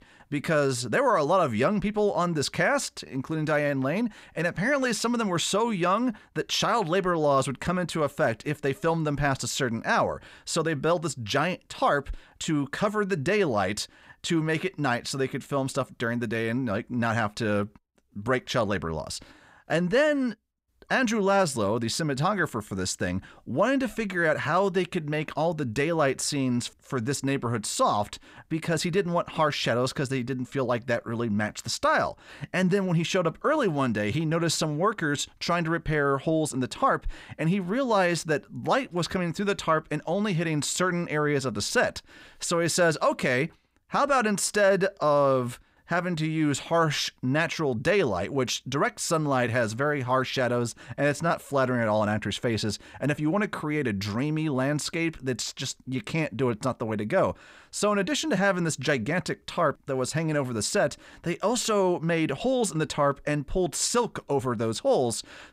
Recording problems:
none

